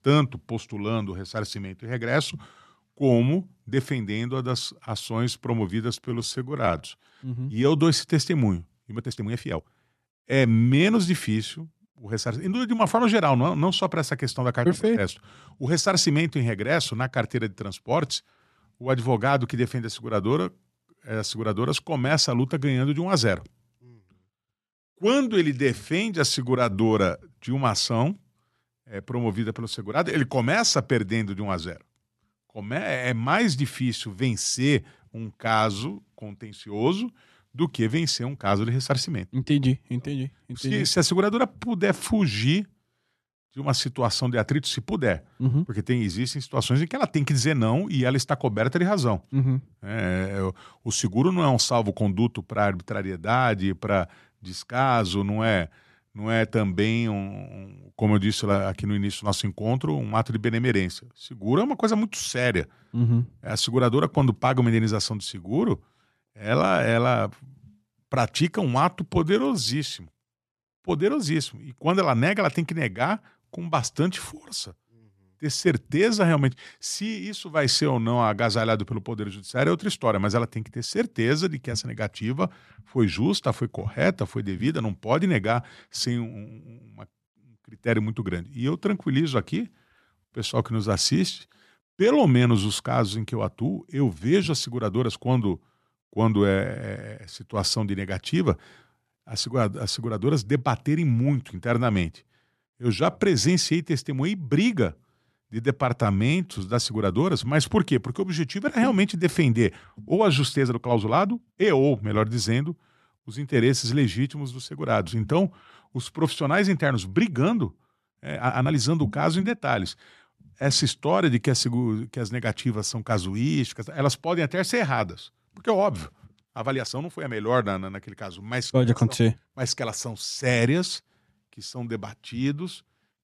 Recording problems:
uneven, jittery; strongly; from 6 s to 2:09

